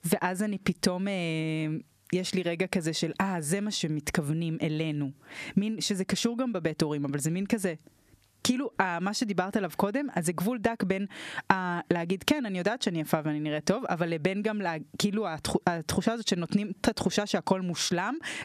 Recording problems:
squashed, flat; somewhat

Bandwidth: 14.5 kHz